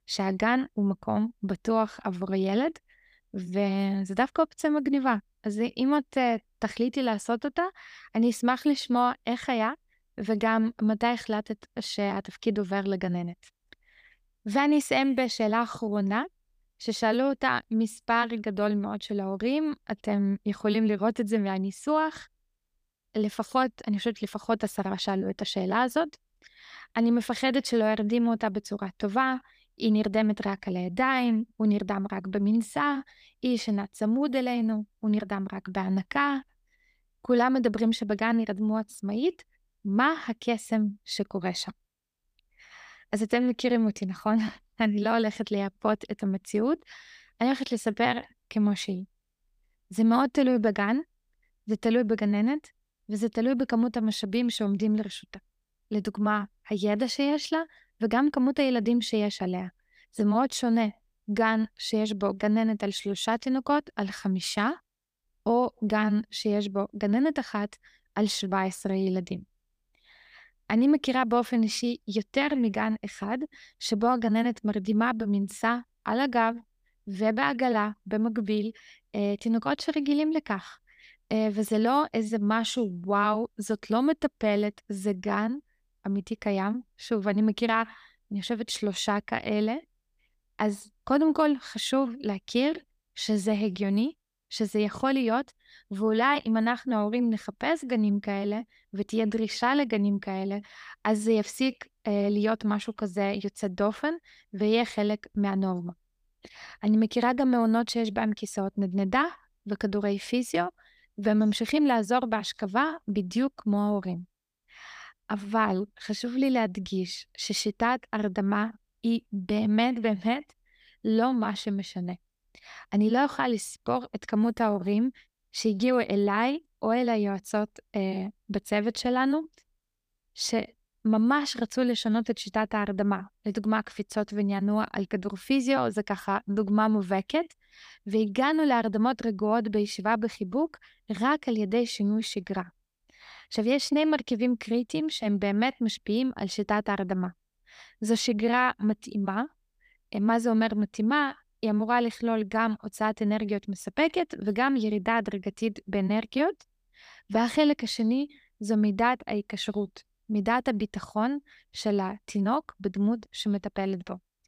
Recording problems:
none

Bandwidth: 15 kHz